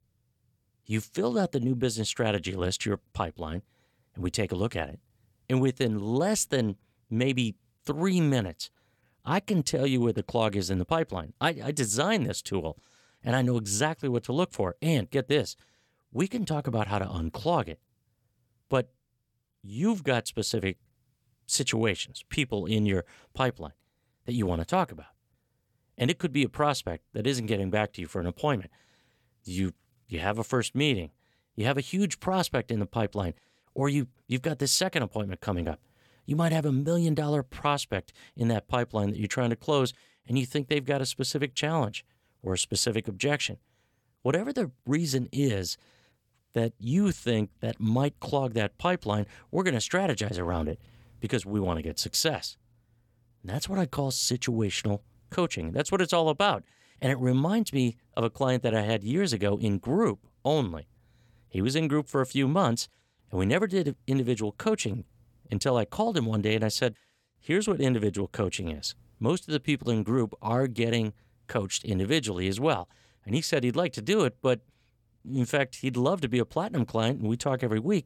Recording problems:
none

